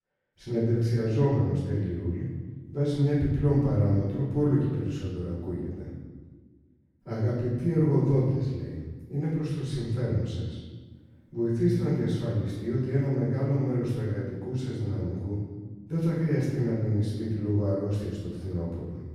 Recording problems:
room echo; strong; dies away in 1.3 s
off-mic speech; far

